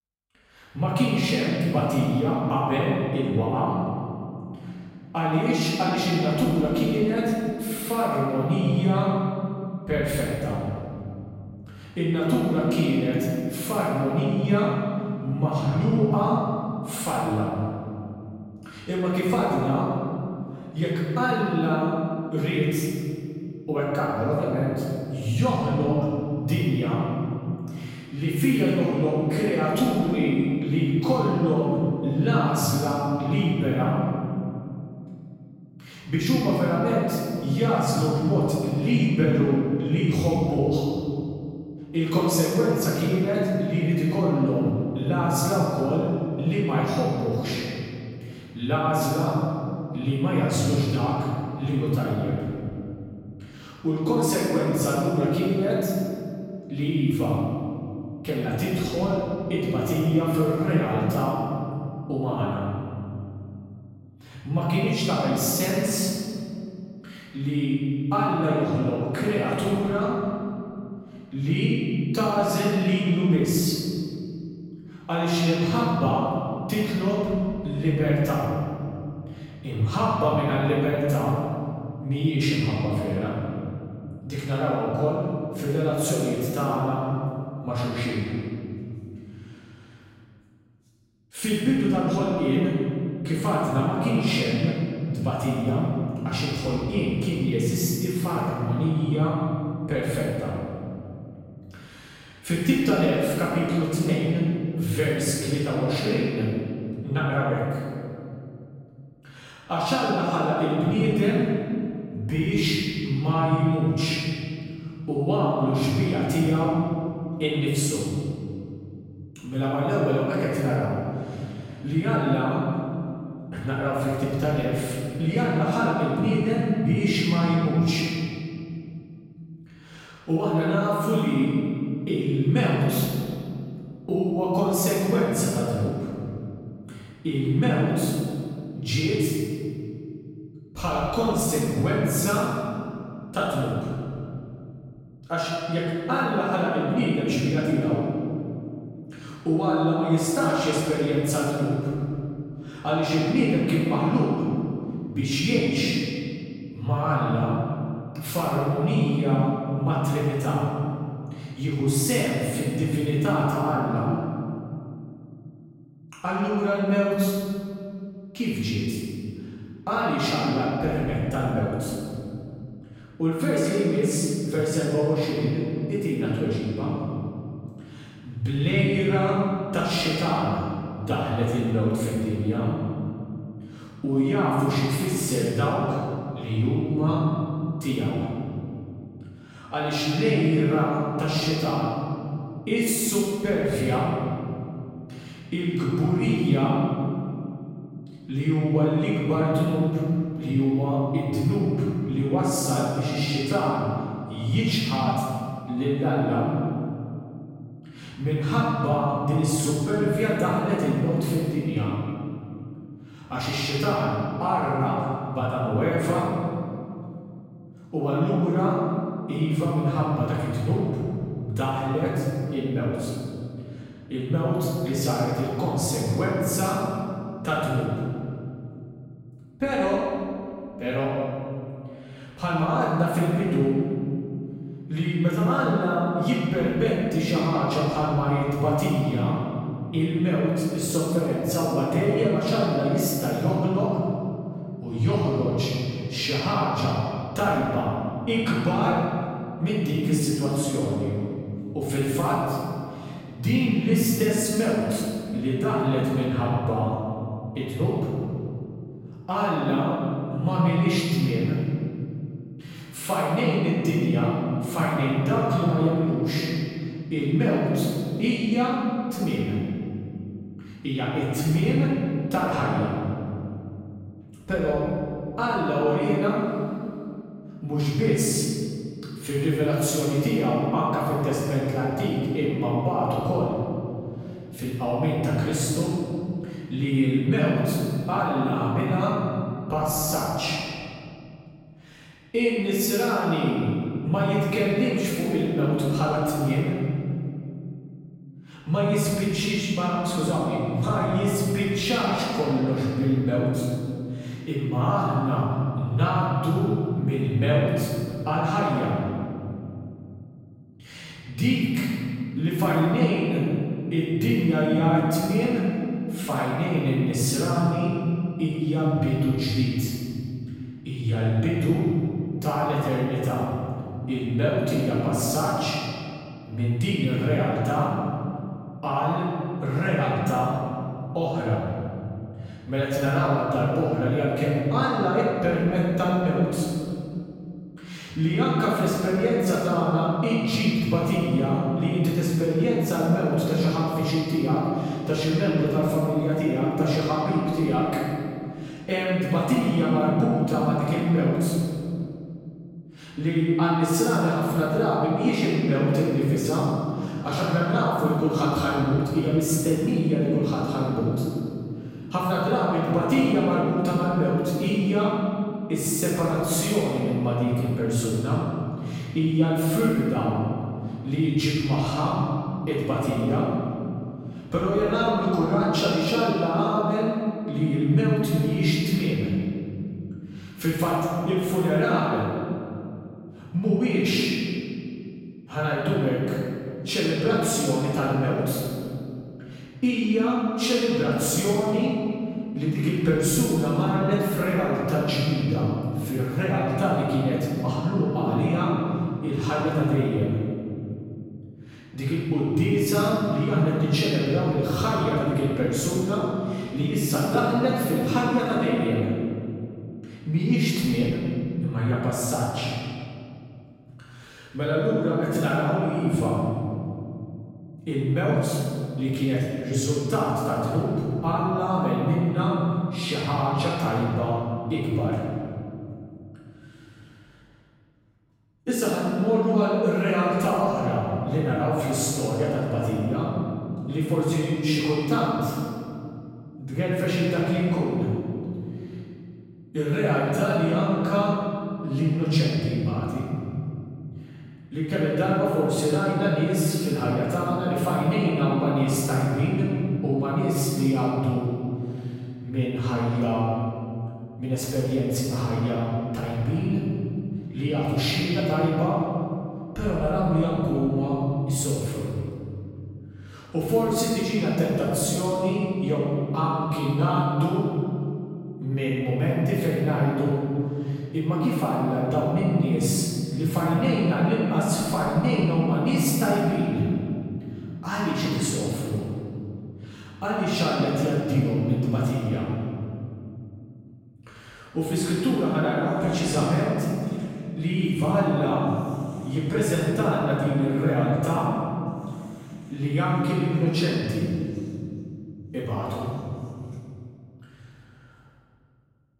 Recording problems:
room echo; strong; dies away in 2.8 s
off-mic speech; far

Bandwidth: 16 kHz